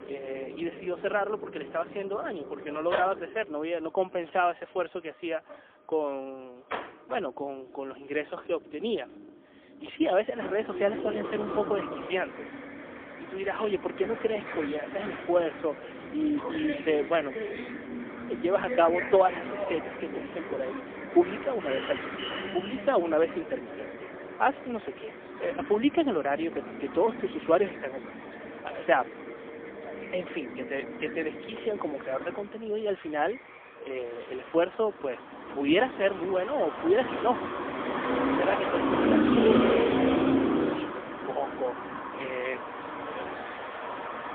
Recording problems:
phone-call audio; poor line; nothing above 3.5 kHz
traffic noise; loud; throughout; 4 dB below the speech

